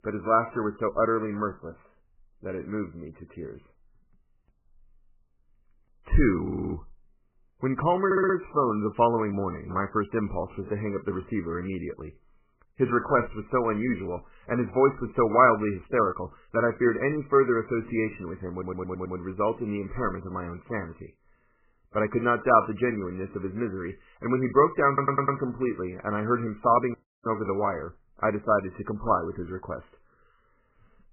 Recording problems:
garbled, watery; badly; nothing above 2.5 kHz
audio stuttering; 4 times, first at 6.5 s
audio cutting out; at 27 s

